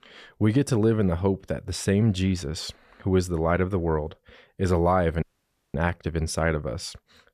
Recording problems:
audio cutting out; at 5 s for 0.5 s

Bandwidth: 14.5 kHz